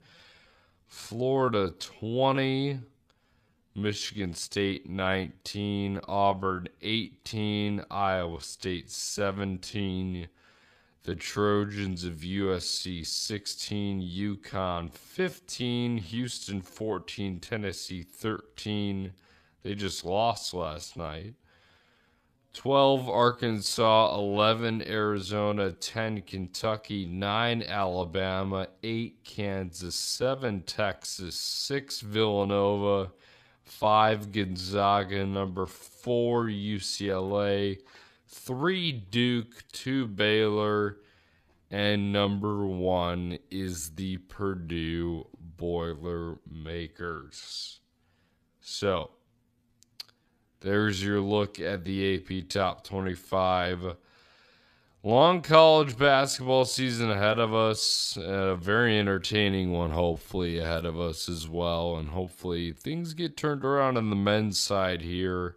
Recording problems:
wrong speed, natural pitch; too slow; 0.6 times normal speed

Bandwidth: 14.5 kHz